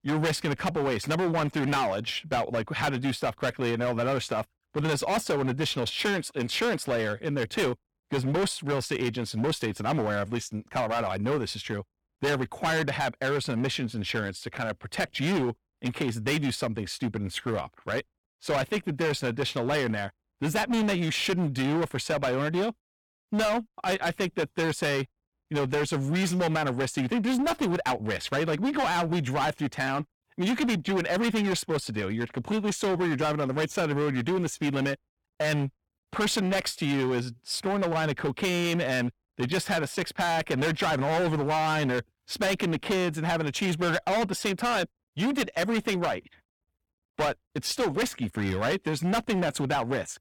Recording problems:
distortion; heavy; 19% of the sound clipped

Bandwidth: 18 kHz